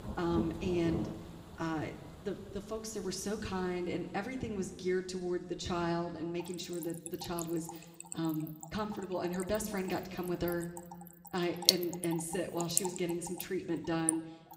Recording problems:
room echo; slight; dies away in 1.2 s
off-mic speech; somewhat distant
rain or running water; loud; throughout; 1 dB below the speech

